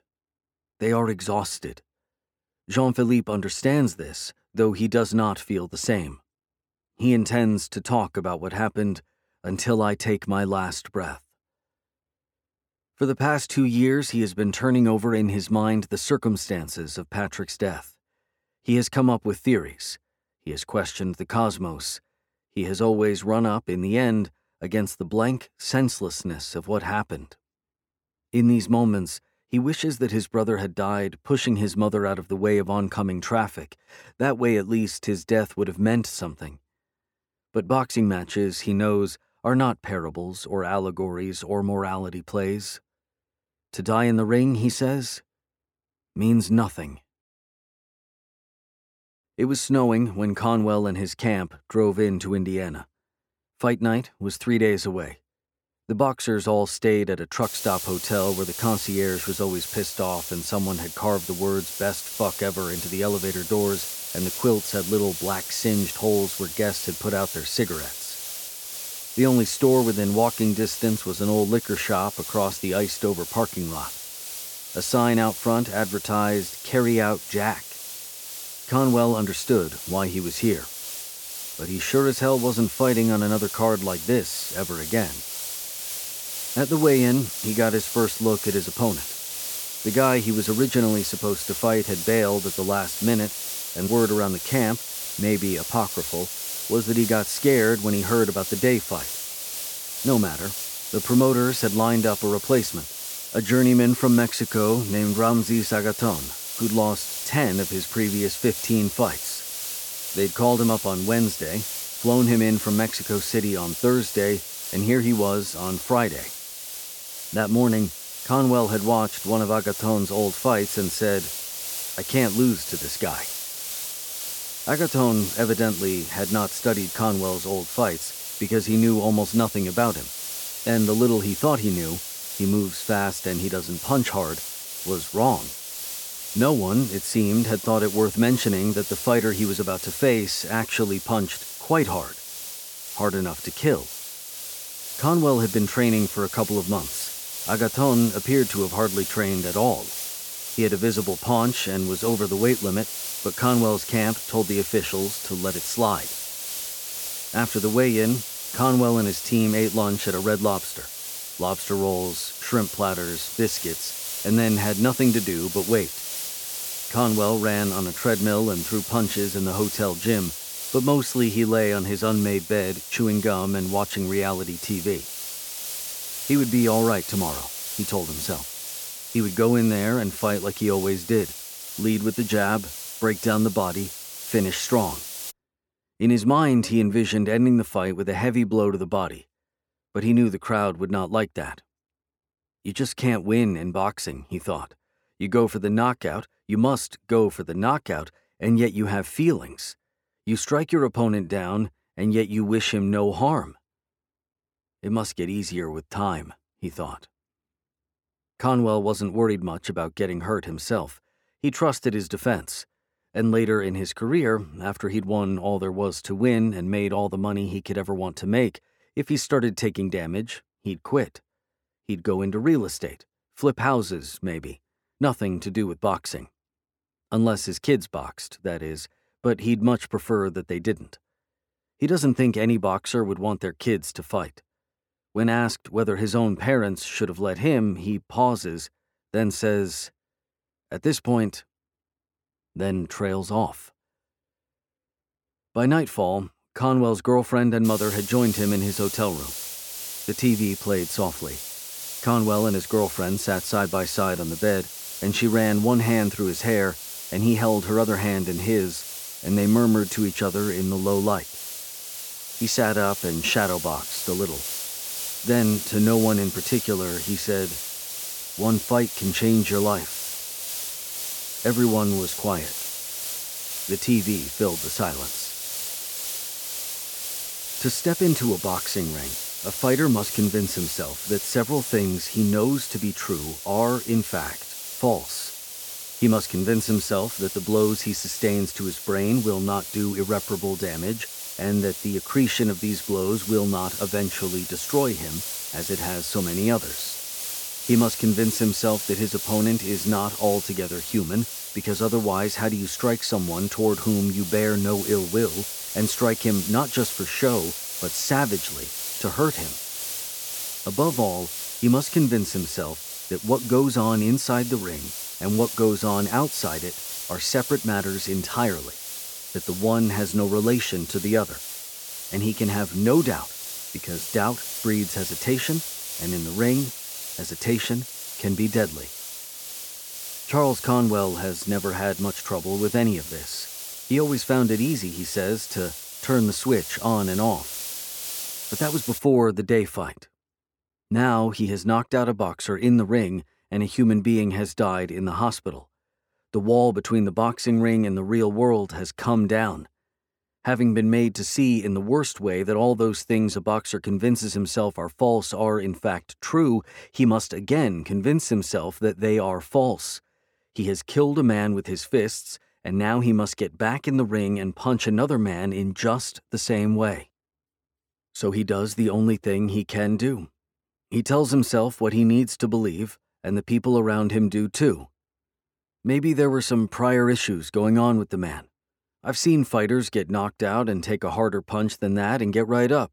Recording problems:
hiss; loud; from 57 s to 3:05 and from 4:08 to 5:39; 7 dB below the speech

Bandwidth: 17.5 kHz